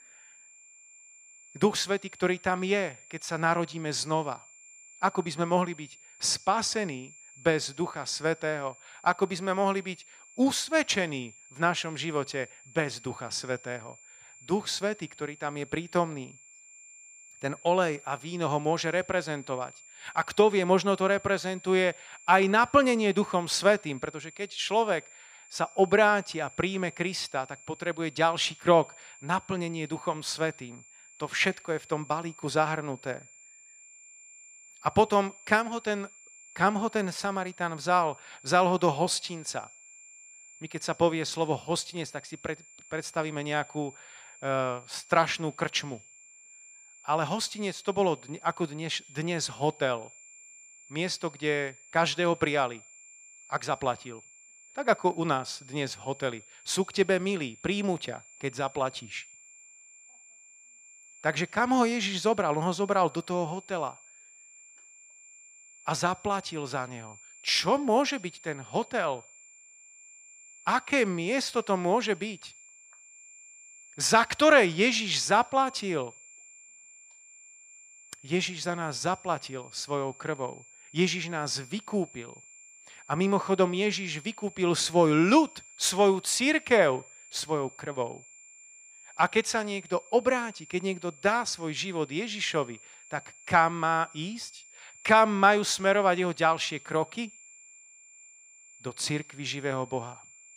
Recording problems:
high-pitched whine; faint; throughout; 7 kHz, 20 dB below the speech

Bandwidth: 15 kHz